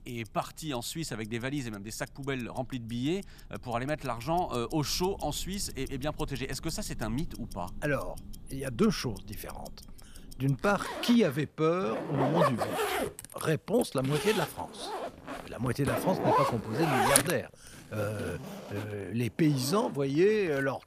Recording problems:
household noises; loud; throughout; 2 dB below the speech

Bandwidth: 14.5 kHz